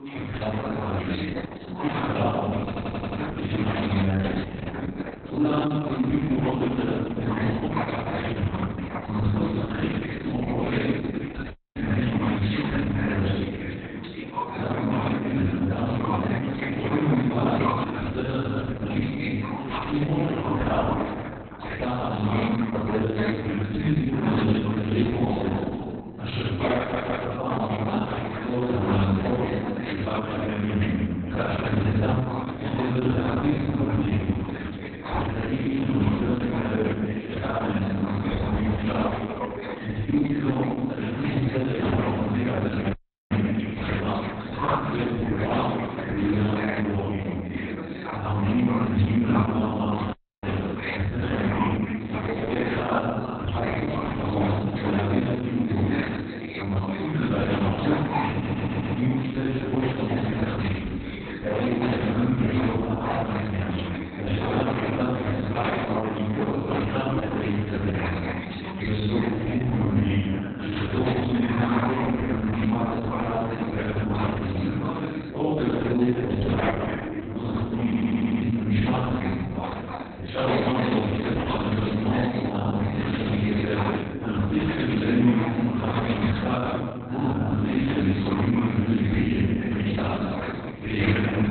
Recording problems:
room echo; strong; dies away in 2.2 s
off-mic speech; far
garbled, watery; badly; nothing above 4 kHz
background chatter; loud; throughout; 4 voices, 8 dB below the speech
audio stuttering; 4 times, first at 2.5 s
audio freezing; at 12 s, at 43 s and at 50 s

